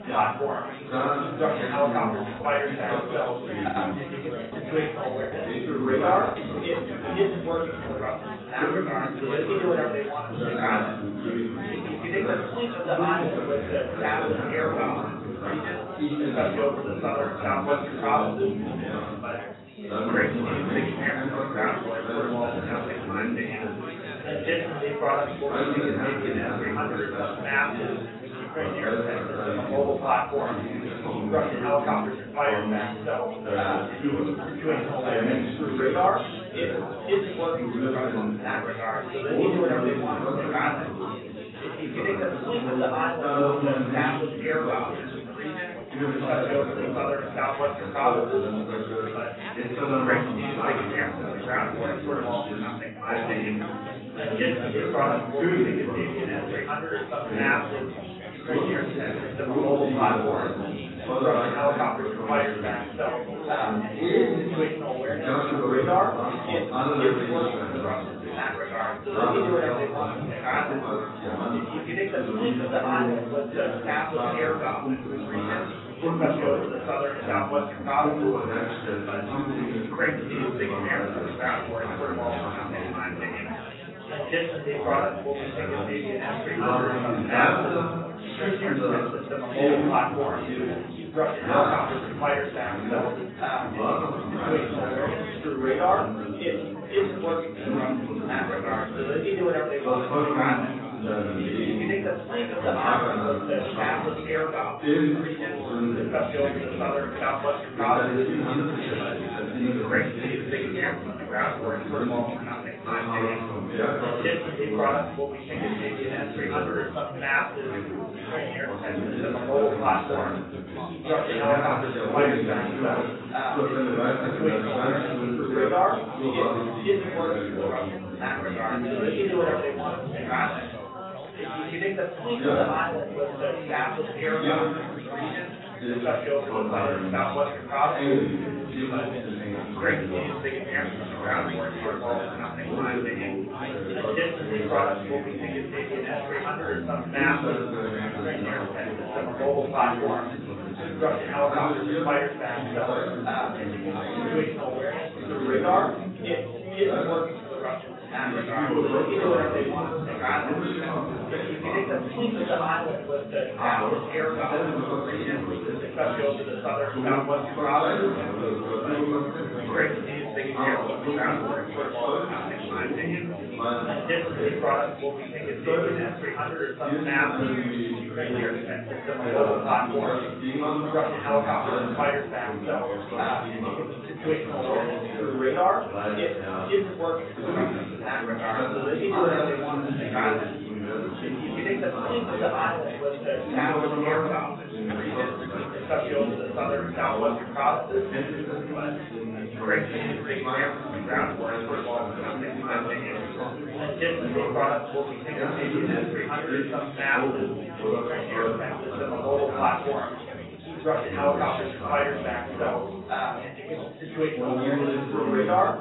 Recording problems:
room echo; strong; dies away in 1.3 s
off-mic speech; far
garbled, watery; badly; nothing above 4 kHz
chatter from many people; very loud; throughout; 2 dB above the speech
high-pitched whine; faint; throughout; 3 kHz, 30 dB below the speech
choppy; very; from 3.5 to 5.5 s; 6% of the speech affected

